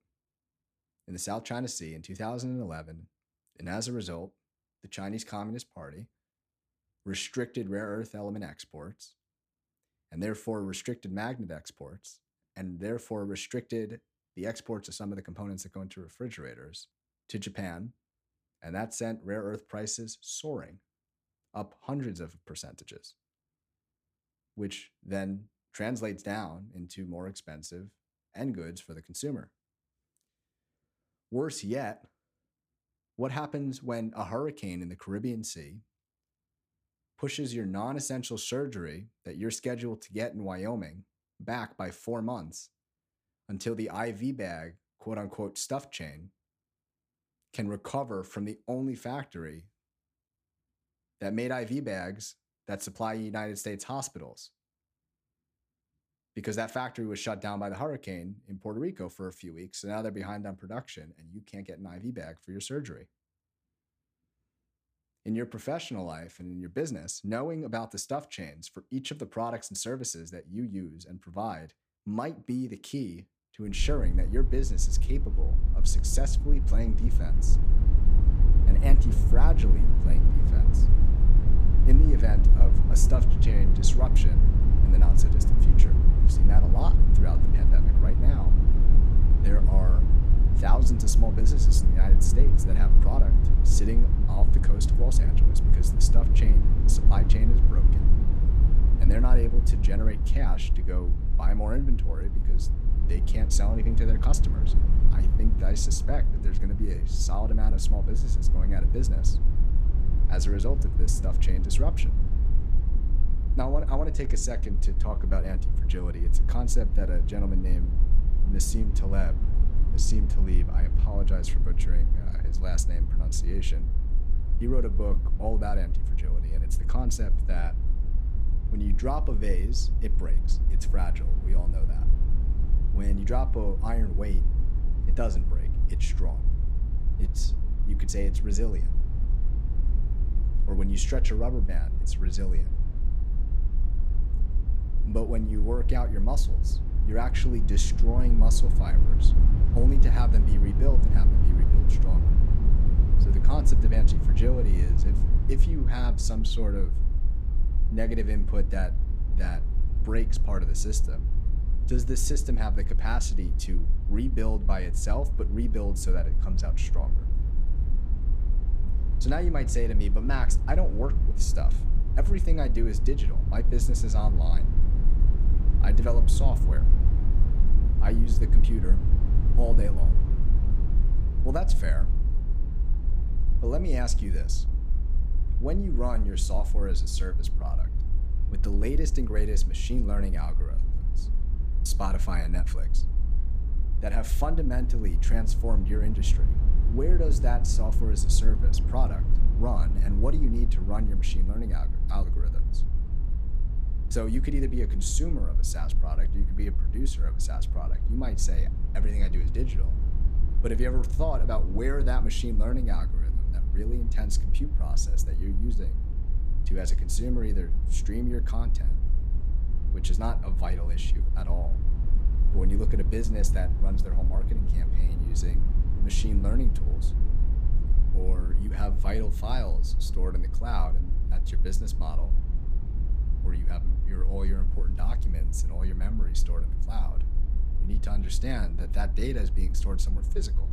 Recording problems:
low rumble; loud; from 1:14 on; 7 dB below the speech

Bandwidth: 15 kHz